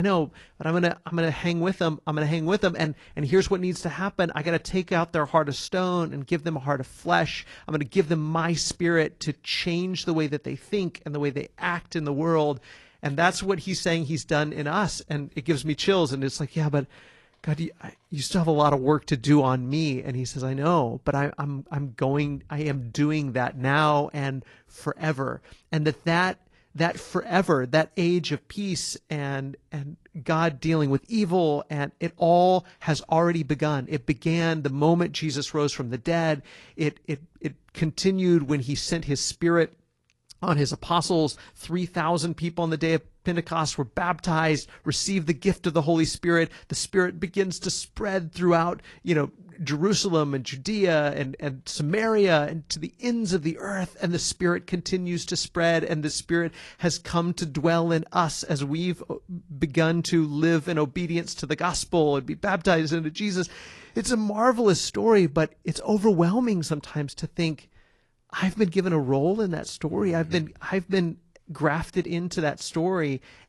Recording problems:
garbled, watery; slightly
abrupt cut into speech; at the start

